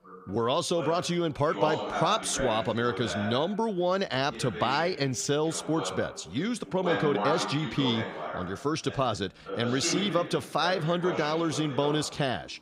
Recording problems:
background chatter; loud; throughout; 2 voices, 7 dB below the speech

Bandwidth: 15.5 kHz